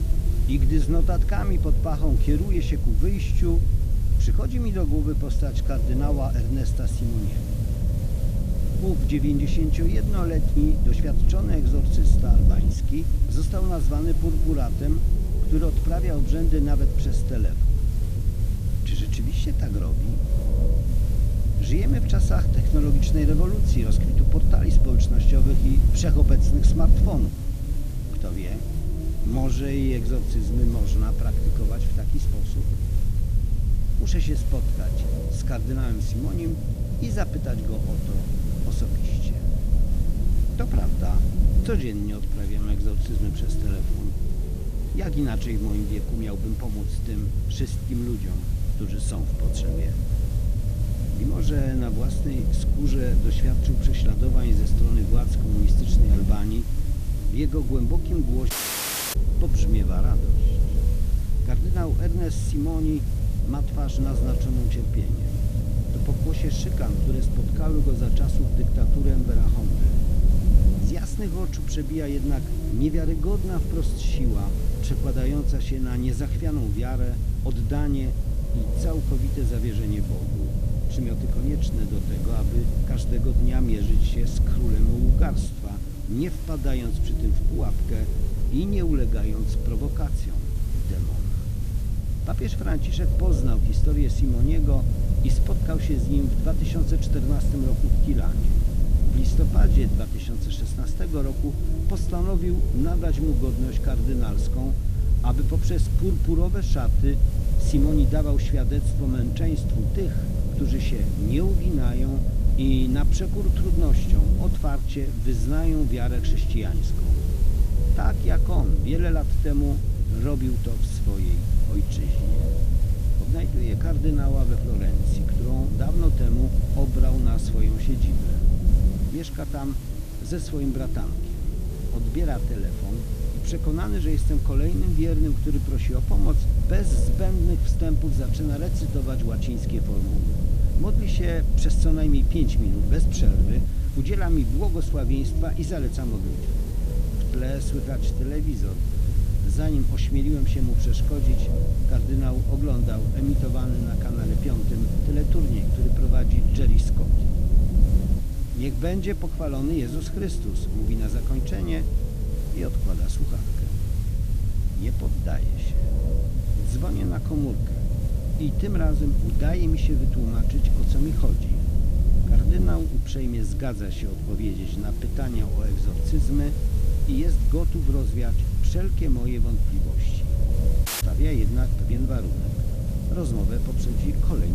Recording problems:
low rumble; loud; throughout; 4 dB below the speech
hiss; noticeable; throughout; 15 dB below the speech
audio cutting out; at 59 s for 0.5 s and at 3:01
abrupt cut into speech; at the end

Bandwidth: 14.5 kHz